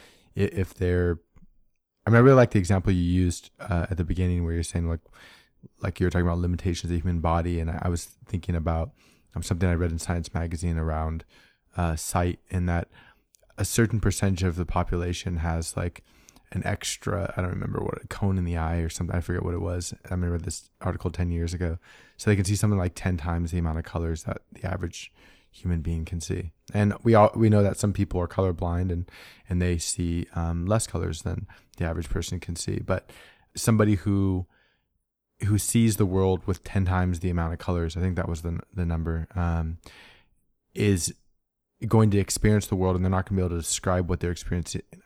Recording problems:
none

